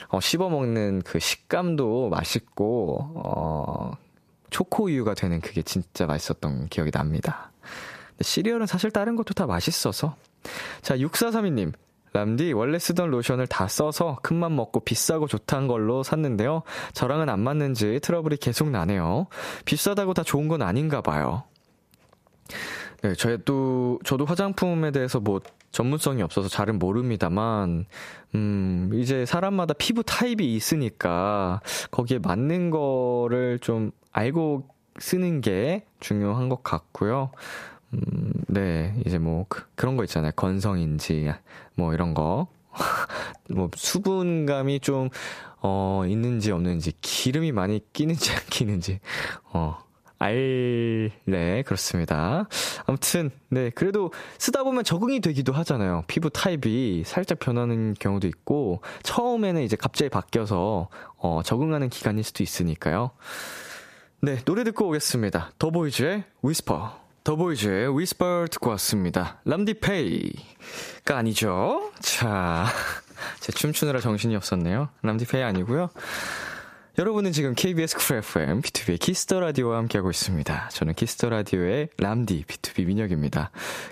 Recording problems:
squashed, flat; heavily

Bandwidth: 14.5 kHz